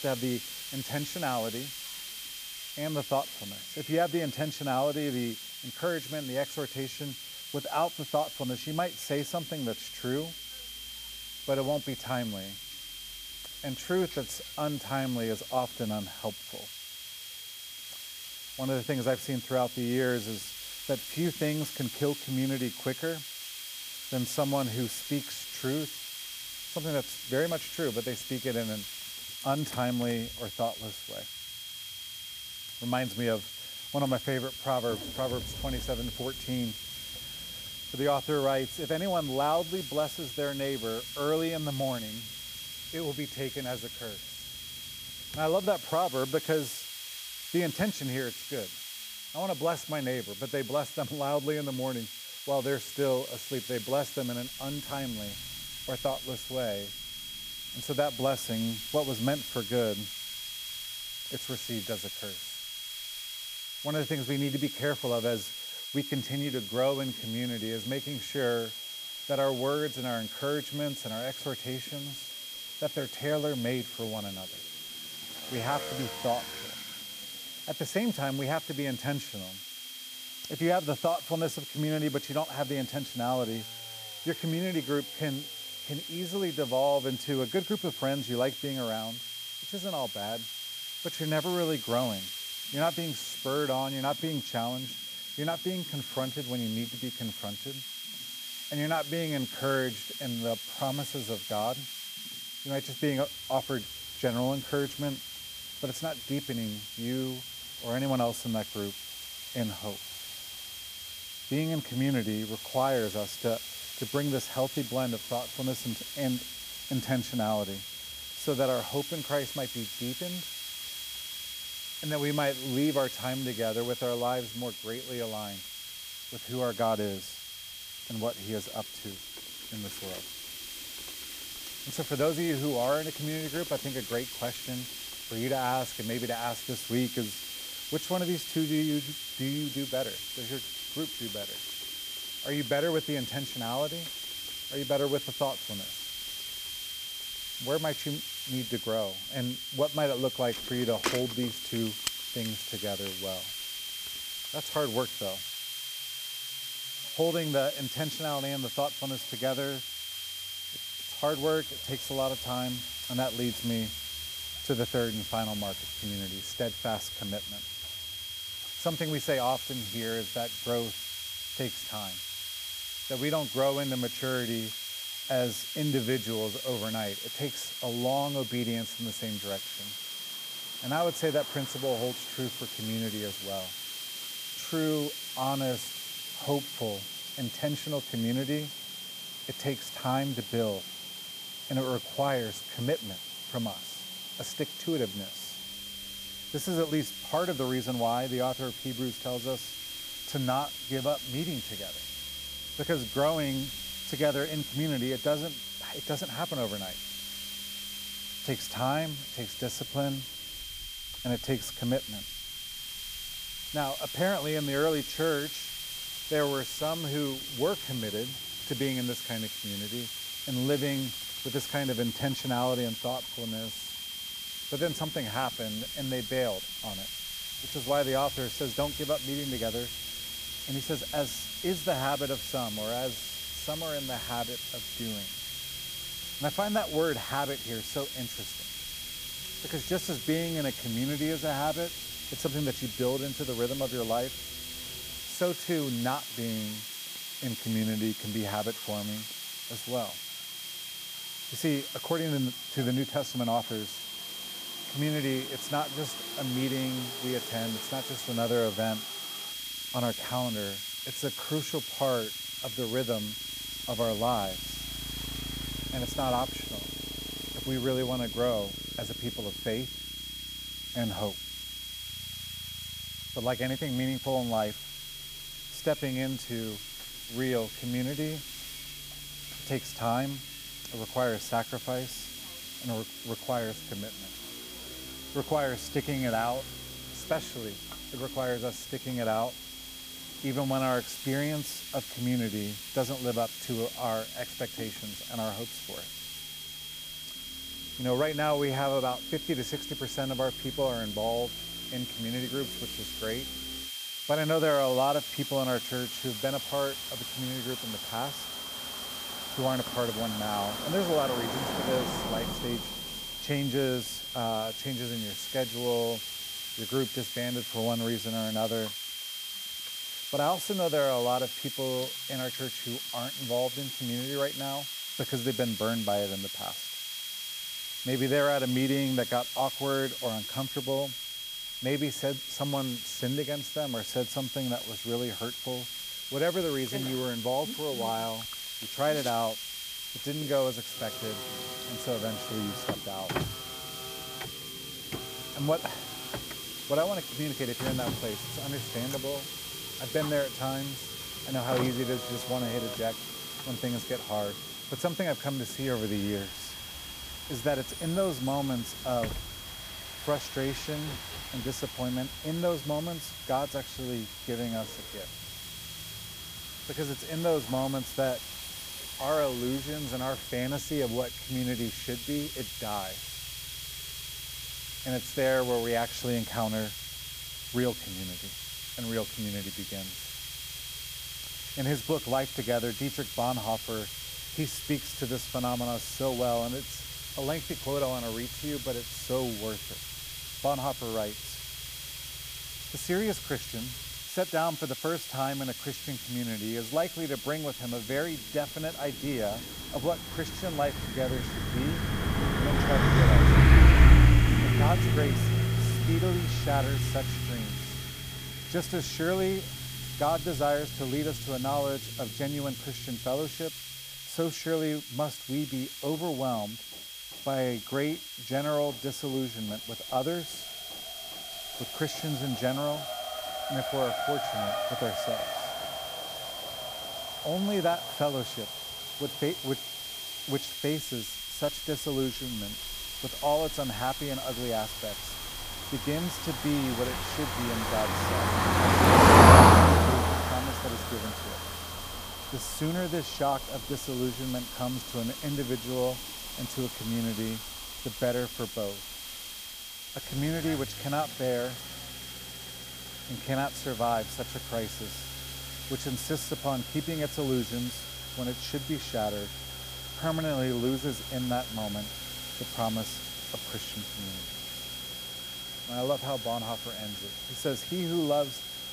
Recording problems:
traffic noise; very loud; throughout; 2 dB above the speech
high-pitched whine; loud; throughout; 3.5 kHz, 7 dB below the speech
hiss; loud; throughout; 7 dB below the speech
machinery noise; faint; throughout; 30 dB below the speech

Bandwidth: 15 kHz